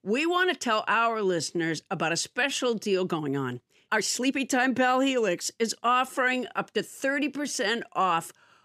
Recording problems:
uneven, jittery; strongly; from 1 to 8 s

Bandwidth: 14.5 kHz